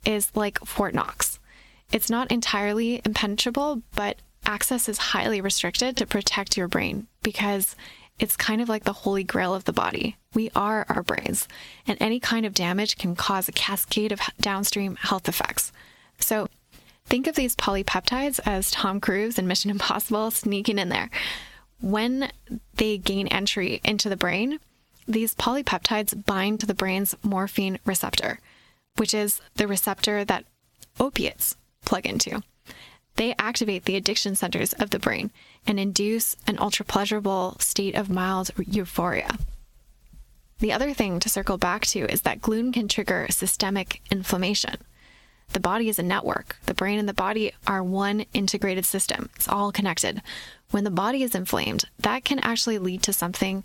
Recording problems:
squashed, flat; heavily

